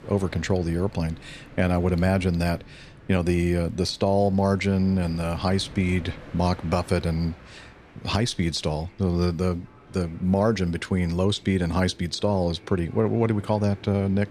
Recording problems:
train or aircraft noise; faint; throughout; 20 dB below the speech

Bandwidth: 14 kHz